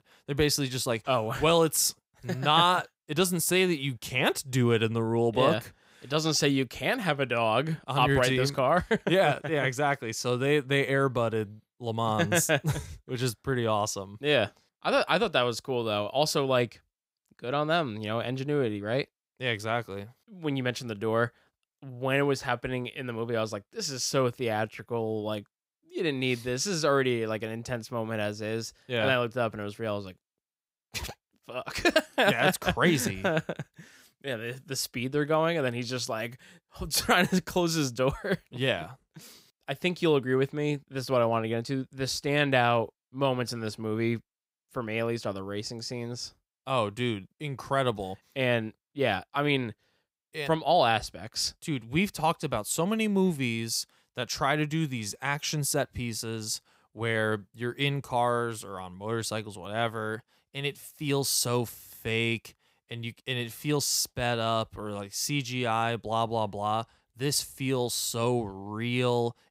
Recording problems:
none

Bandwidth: 15.5 kHz